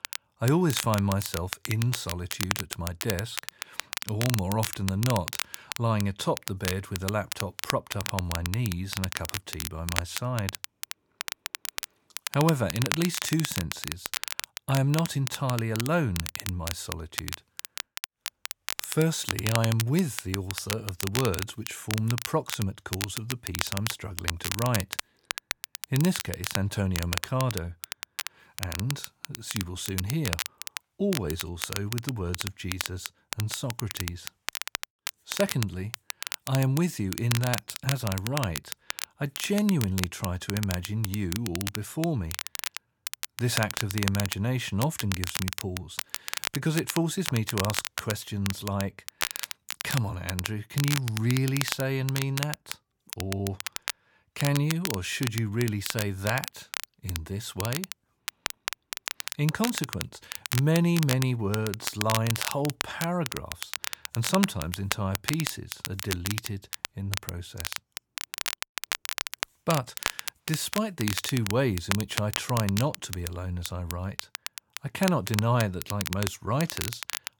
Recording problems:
crackle, like an old record; loud; 5 dB below the speech

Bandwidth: 18.5 kHz